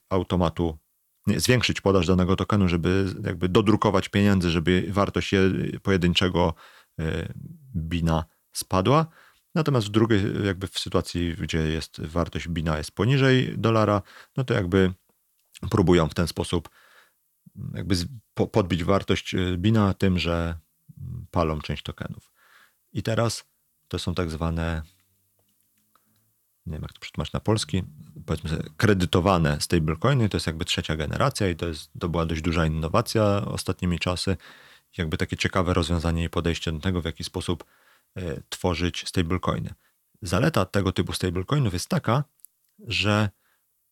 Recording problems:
none

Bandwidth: 18.5 kHz